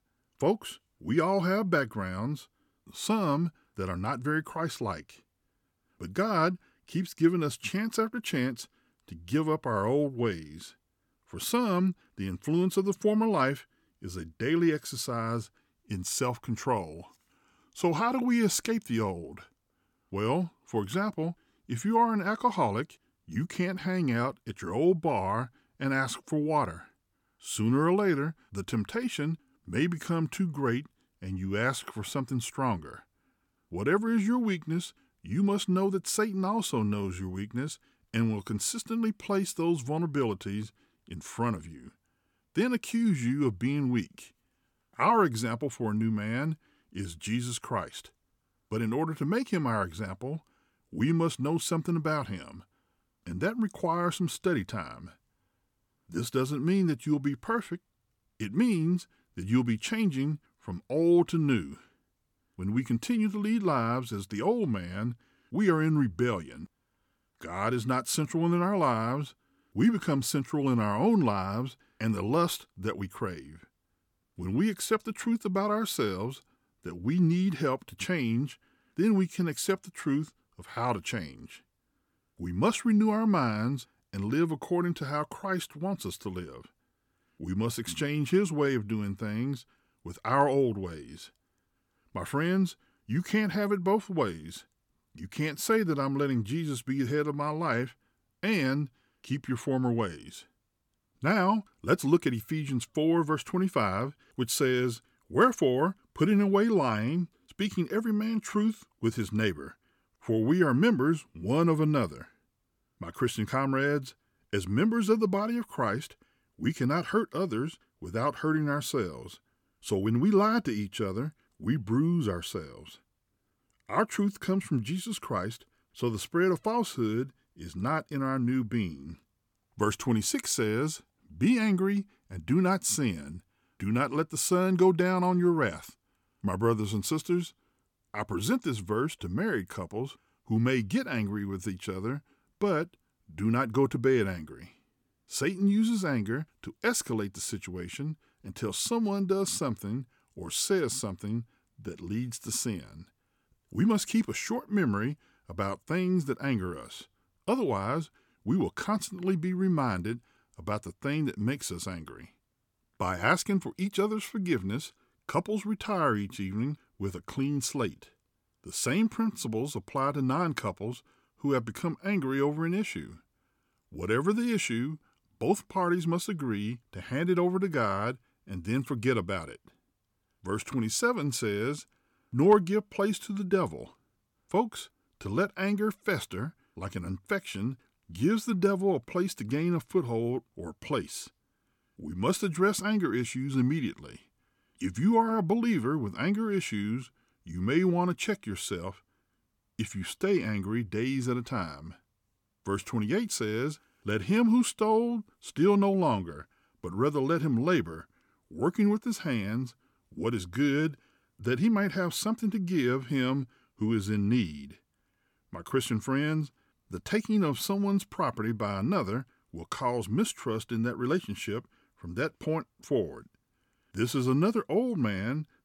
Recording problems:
none

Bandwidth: 17.5 kHz